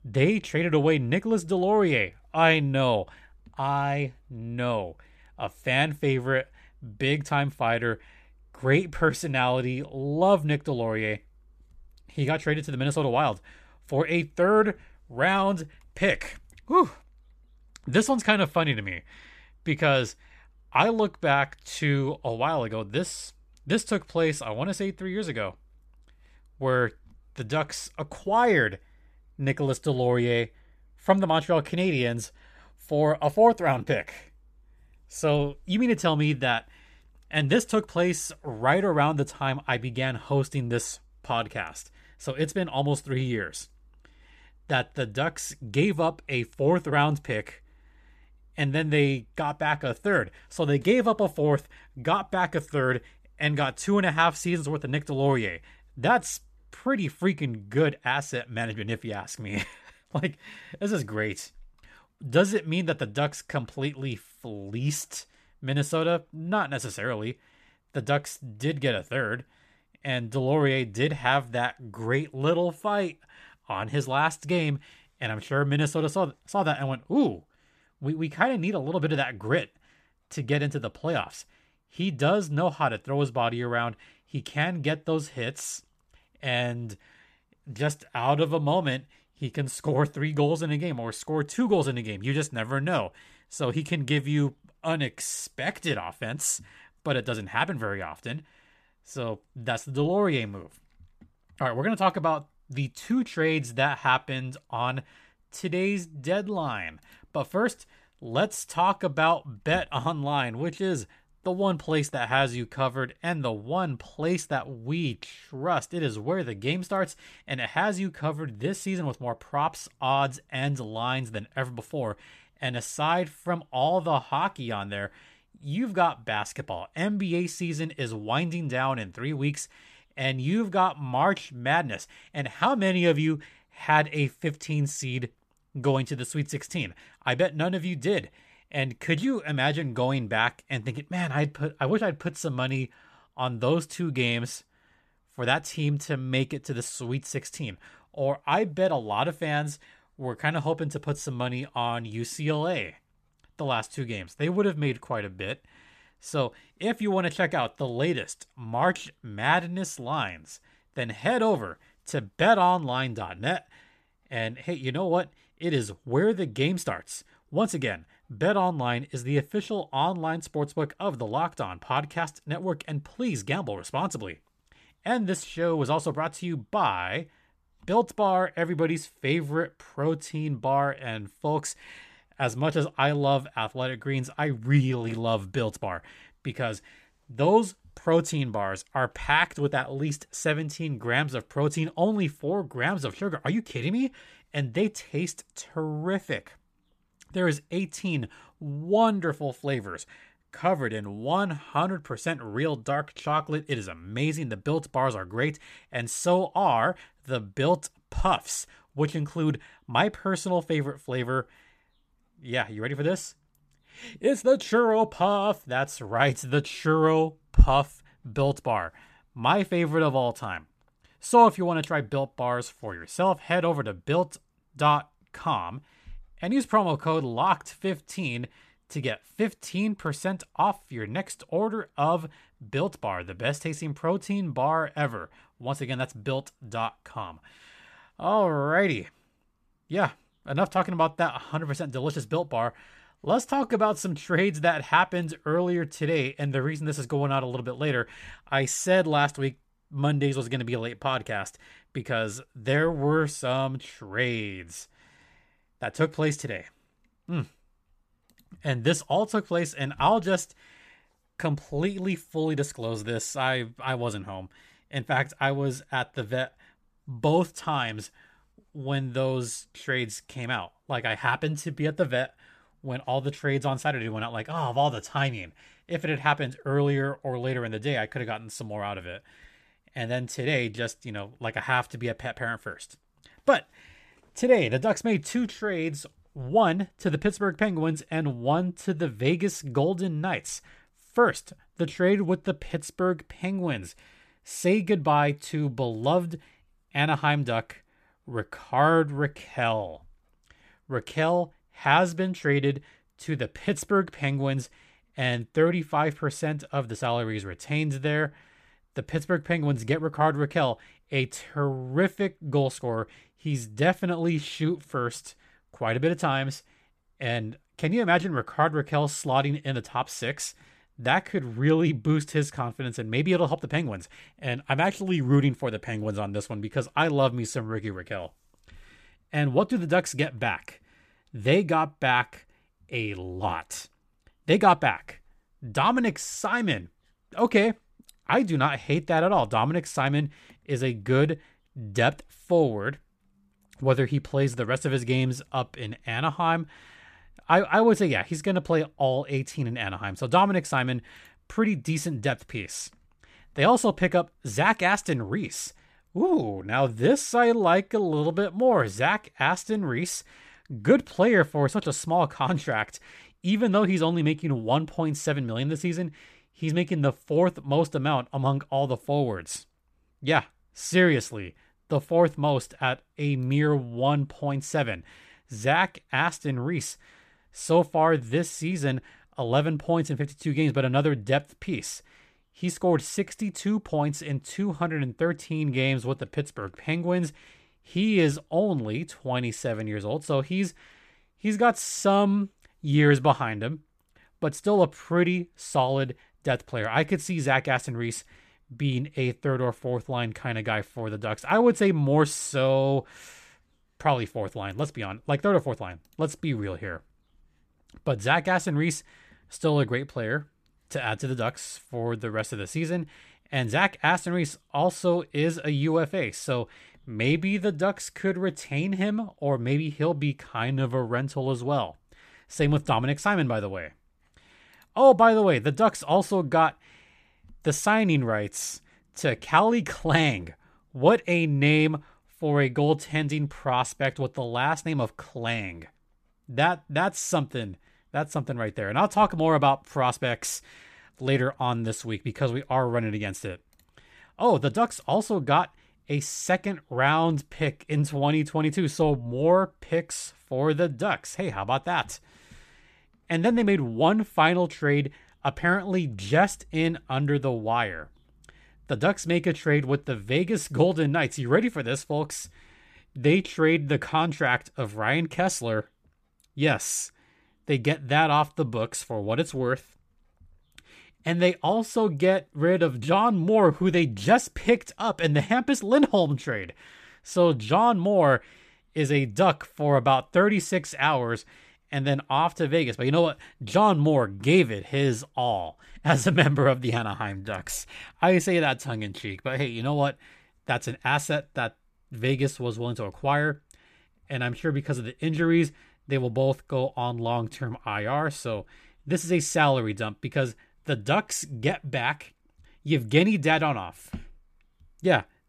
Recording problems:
none

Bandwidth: 14.5 kHz